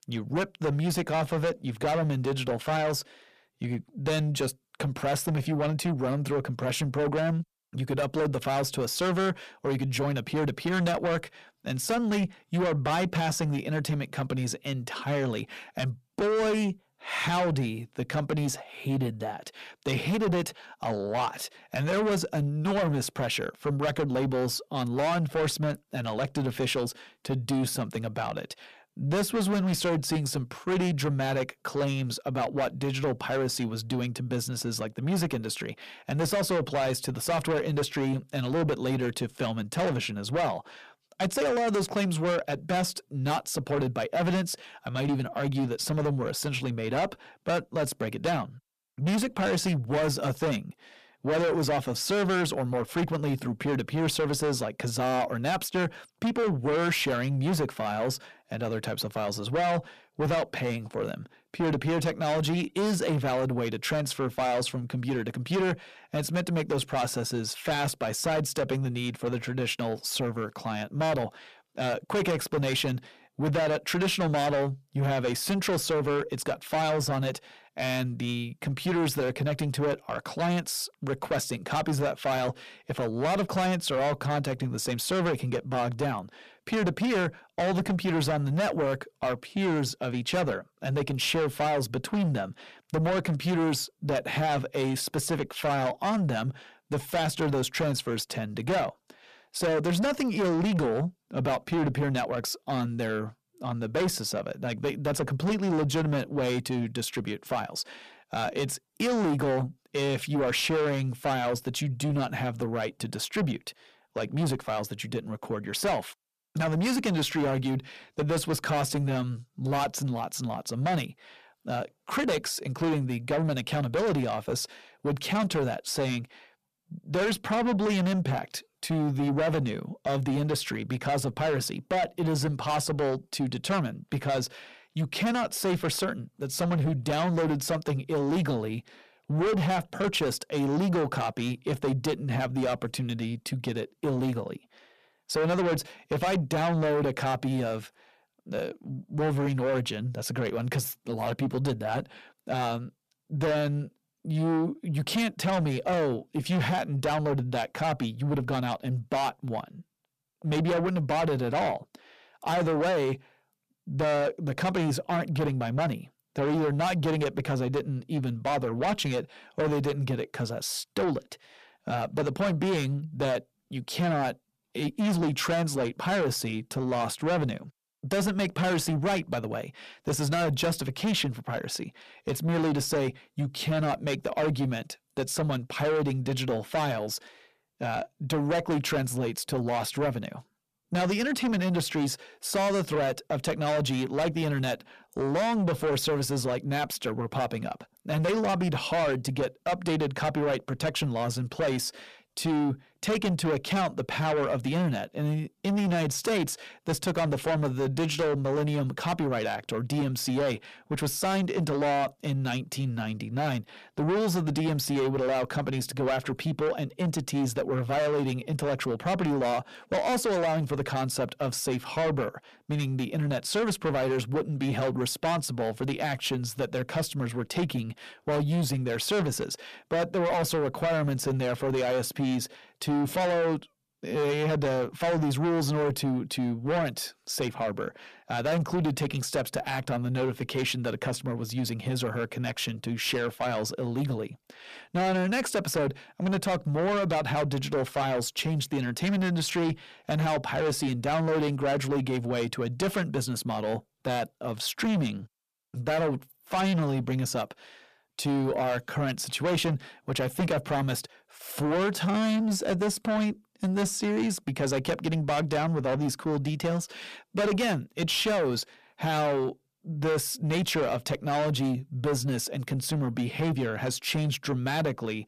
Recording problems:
distortion; heavy; 7 dB below the speech

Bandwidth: 14.5 kHz